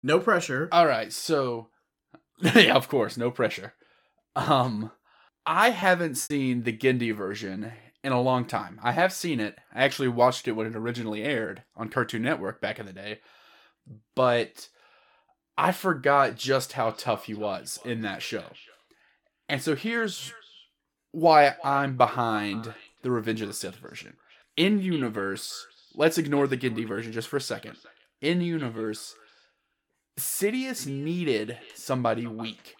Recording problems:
echo of what is said; faint; from 17 s on; 340 ms later, 25 dB below the speech
choppy; very; at 6 s; 9% of the speech affected

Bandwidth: 17.5 kHz